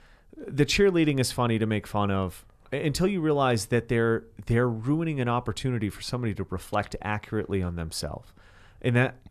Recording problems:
none

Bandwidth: 13.5 kHz